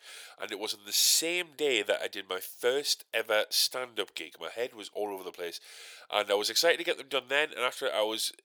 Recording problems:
thin; very; fading below 600 Hz

